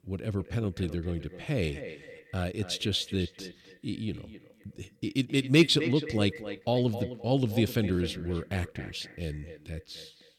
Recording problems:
echo of what is said; noticeable; throughout; 260 ms later, 10 dB below the speech

